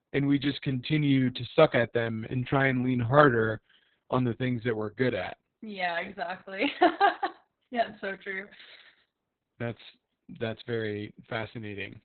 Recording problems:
garbled, watery; badly; nothing above 4 kHz

